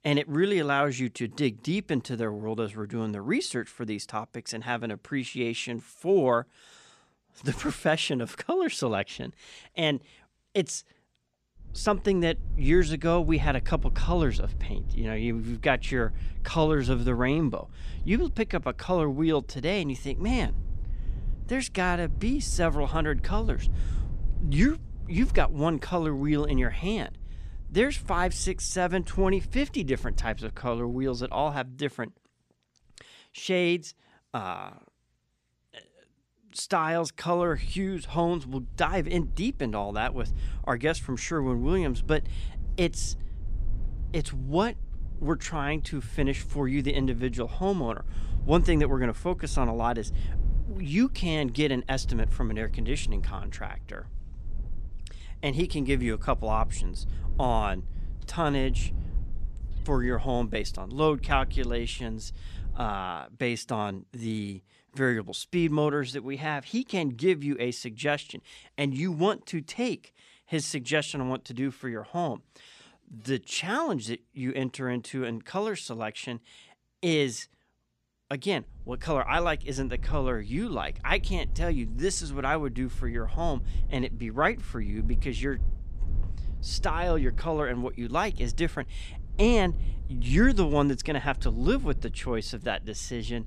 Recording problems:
low rumble; faint; from 12 to 31 s, from 38 s to 1:03 and from 1:19 on; 25 dB below the speech

